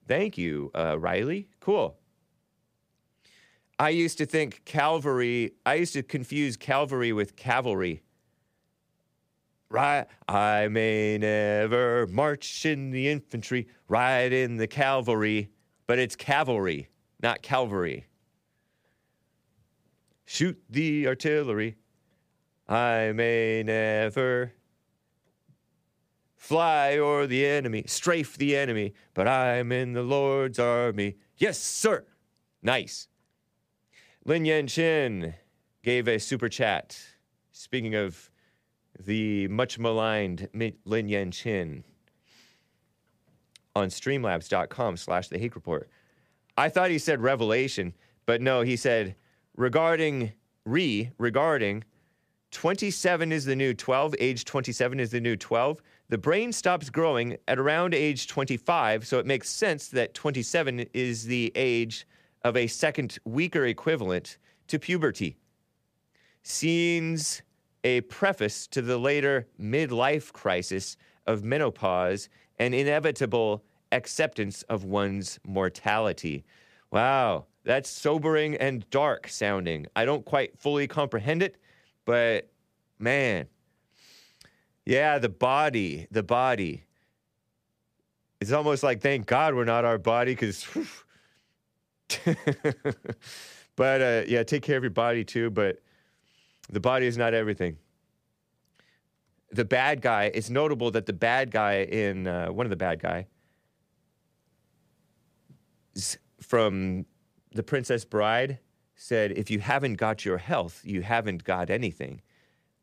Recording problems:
none

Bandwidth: 15 kHz